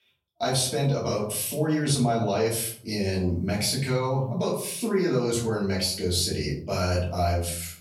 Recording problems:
off-mic speech; far
room echo; slight; dies away in 0.5 s

